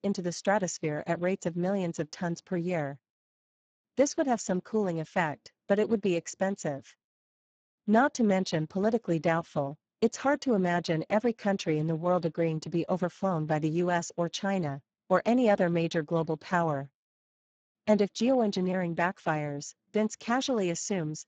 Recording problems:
garbled, watery; badly; nothing above 7.5 kHz

